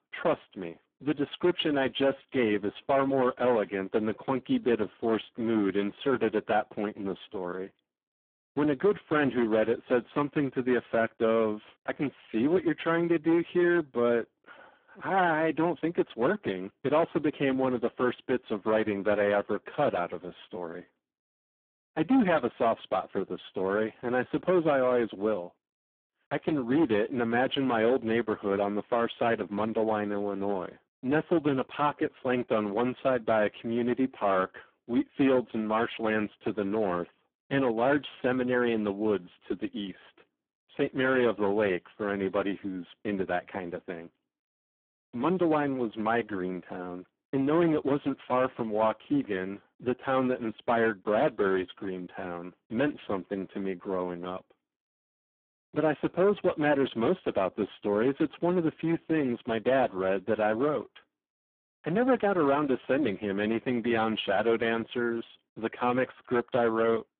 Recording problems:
phone-call audio; poor line
distortion; slight; 8% of the sound clipped

